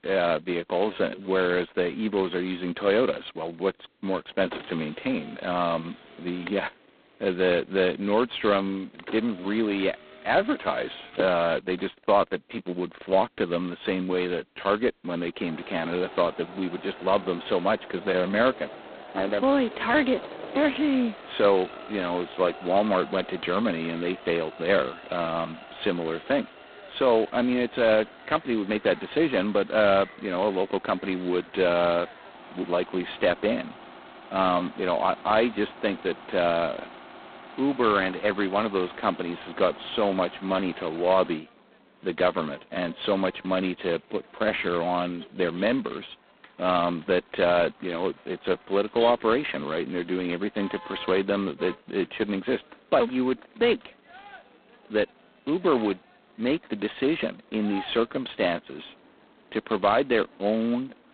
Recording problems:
phone-call audio; poor line; nothing above 4 kHz
traffic noise; noticeable; throughout; 20 dB below the speech

